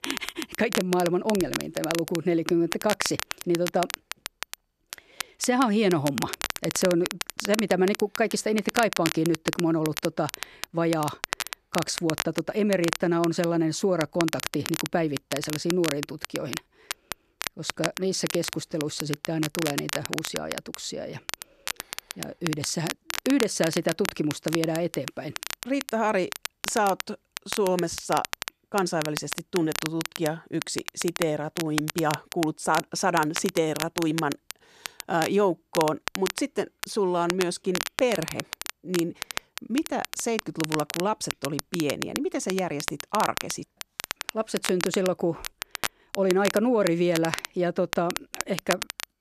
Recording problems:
crackle, like an old record; loud; 7 dB below the speech

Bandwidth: 13.5 kHz